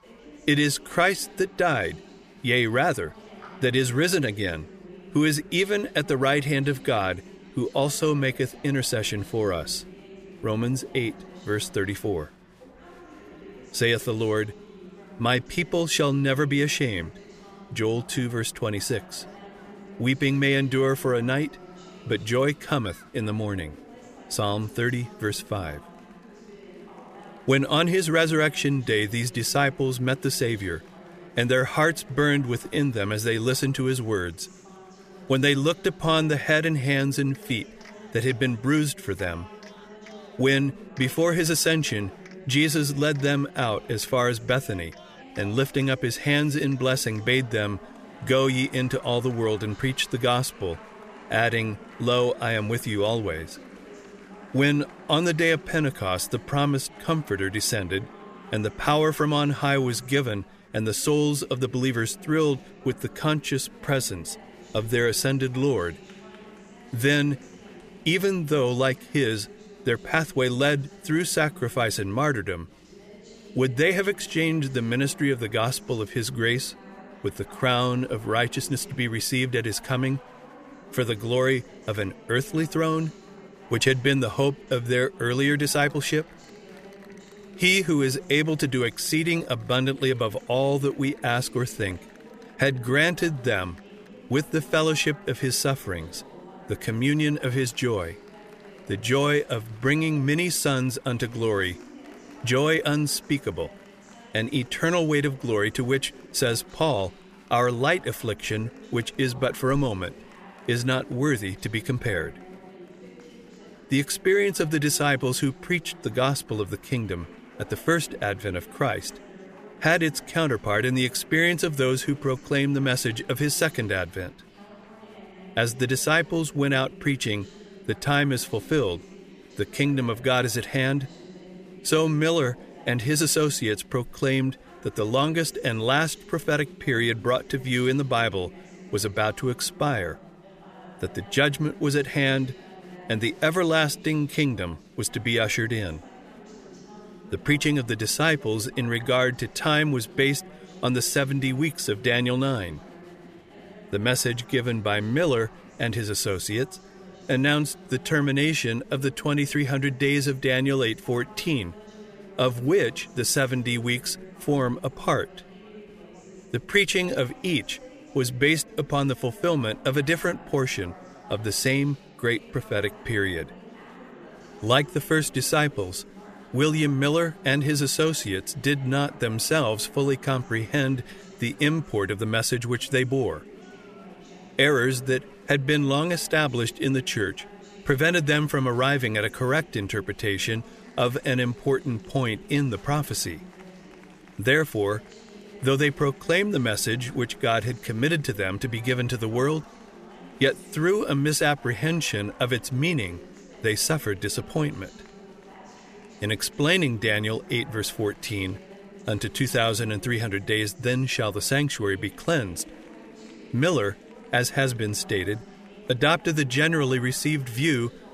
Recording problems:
chatter from many people; faint; throughout; 20 dB below the speech

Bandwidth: 14.5 kHz